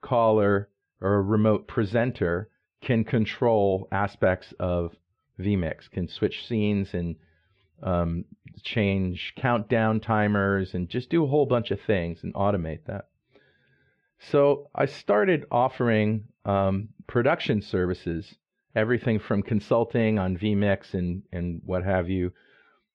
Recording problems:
muffled; very; fading above 3 kHz

